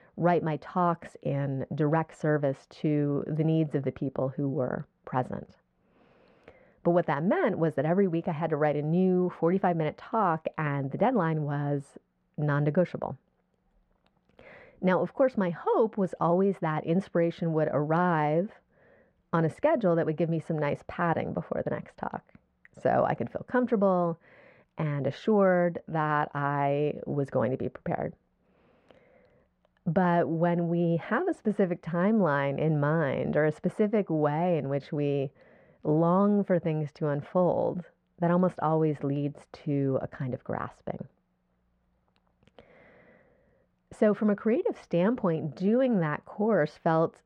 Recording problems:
muffled; very; fading above 3.5 kHz

